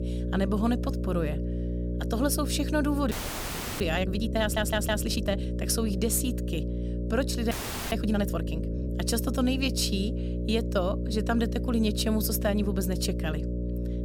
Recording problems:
electrical hum; loud; throughout; 60 Hz, 9 dB below the speech
audio freezing; at 3 s for 0.5 s and at 7.5 s
audio stuttering; at 4.5 s

